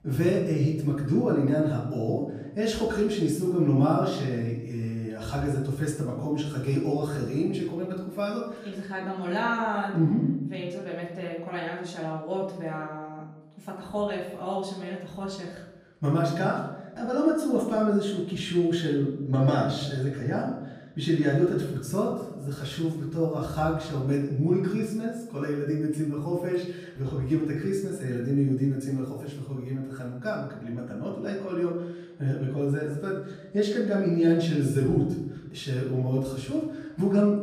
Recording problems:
off-mic speech; far
room echo; noticeable; dies away in 0.8 s

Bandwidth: 15 kHz